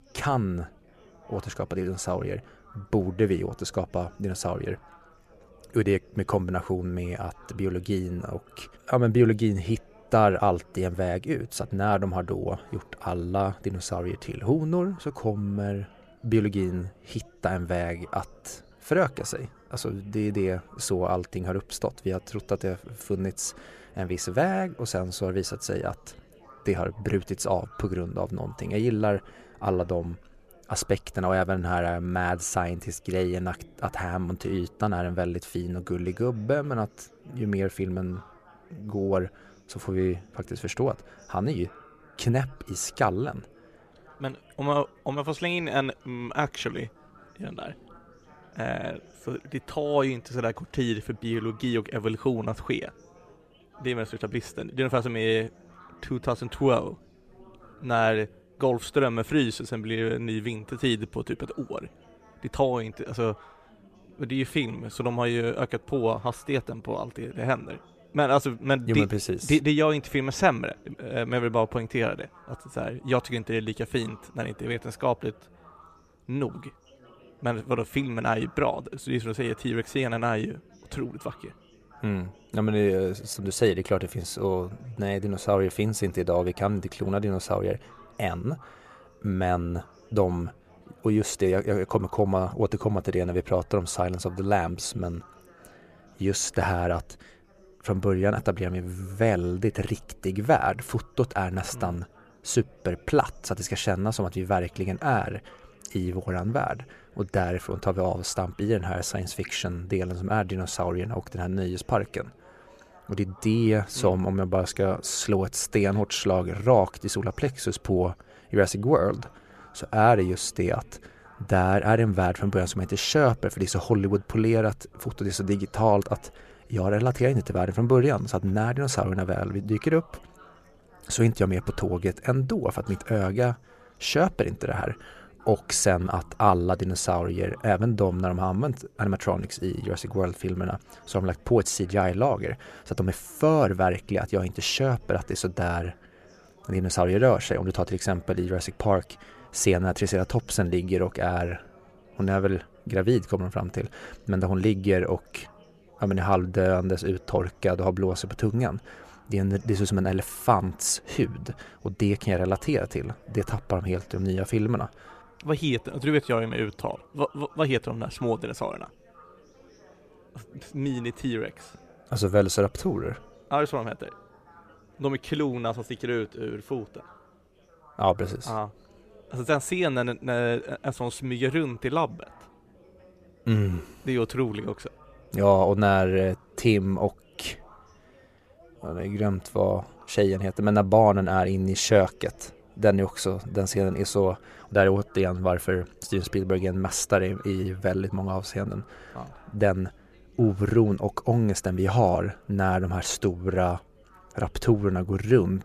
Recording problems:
background chatter; faint; throughout; 4 voices, 25 dB below the speech

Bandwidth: 14.5 kHz